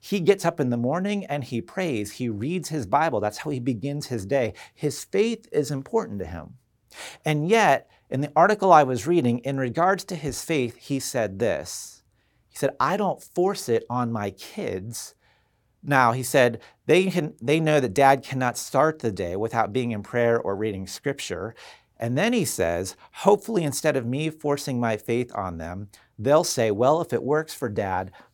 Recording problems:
none

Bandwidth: 18 kHz